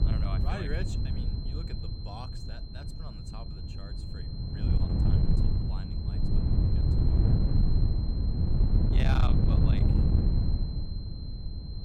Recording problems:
distortion; slight; 8% of the sound clipped
wind noise on the microphone; heavy; 2 dB above the speech
high-pitched whine; loud; throughout; 4 kHz, 6 dB below the speech

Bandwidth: 18 kHz